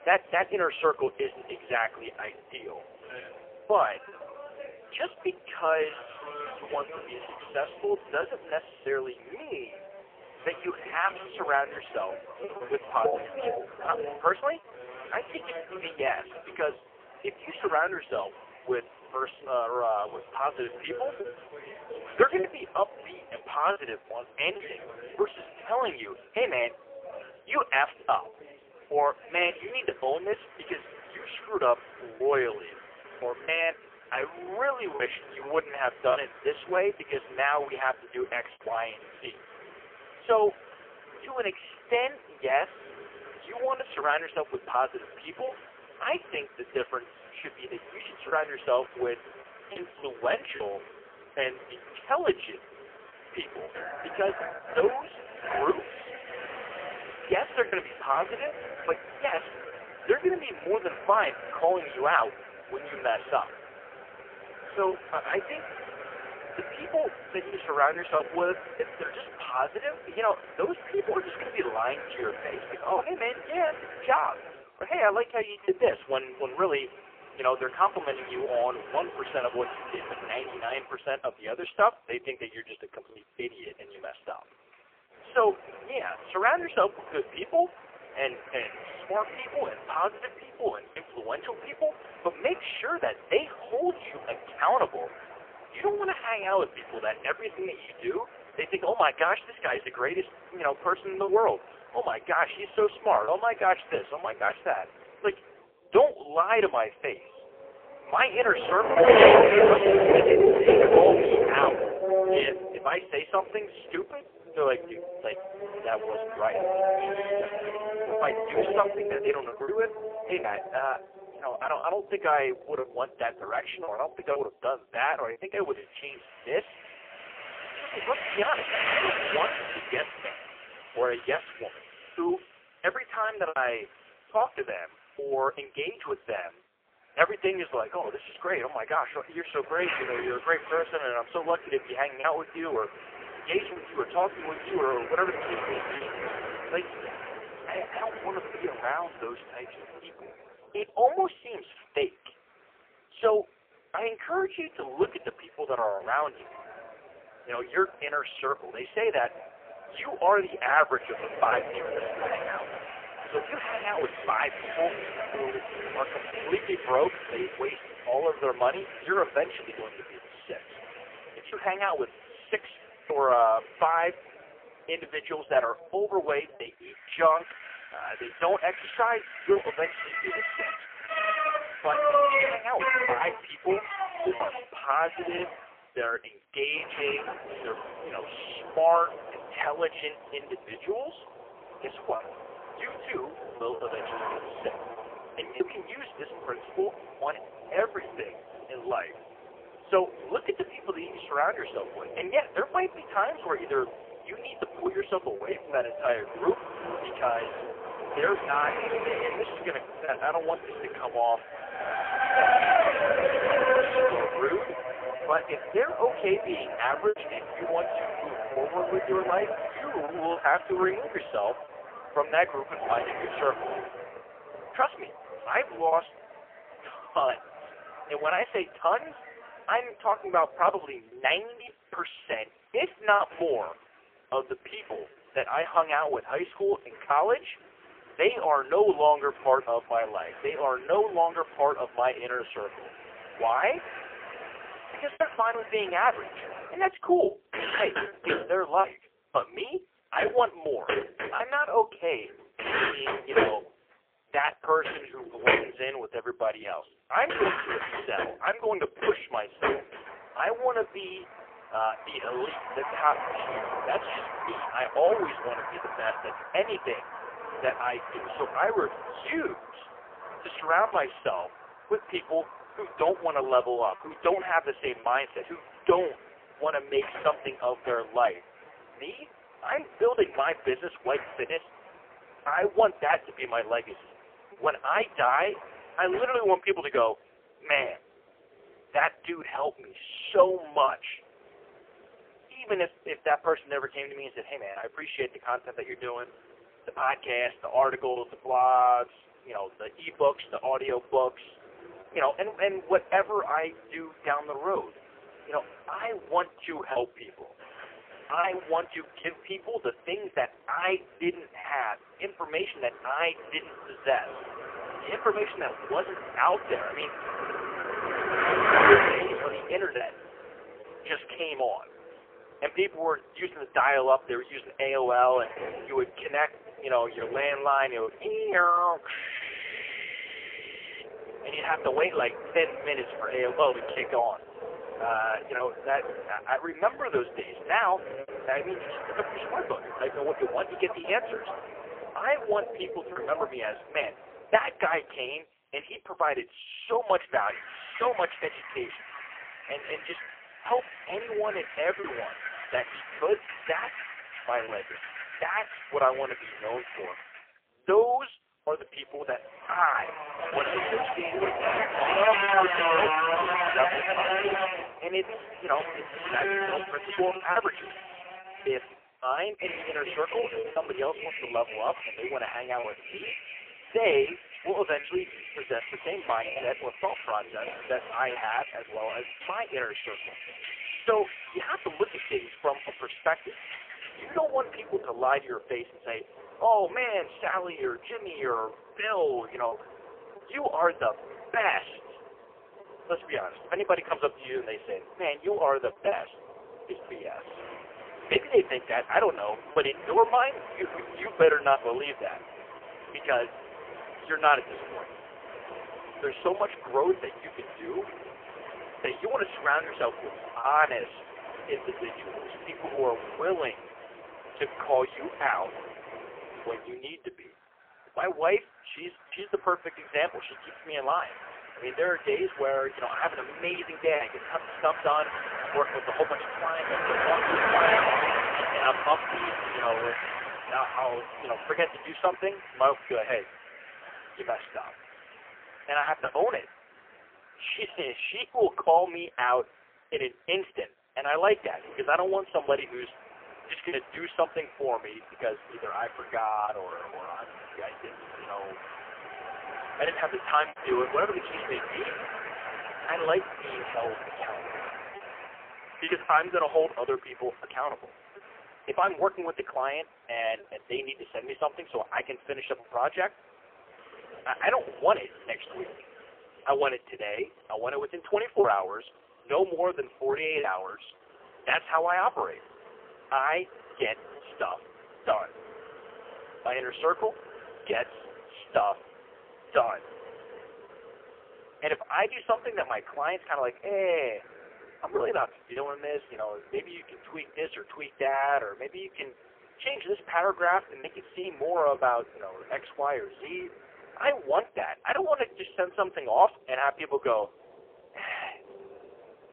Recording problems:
phone-call audio; poor line; nothing above 3 kHz
traffic noise; loud; throughout; 3 dB below the speech
choppy; occasionally; 1% of the speech affected

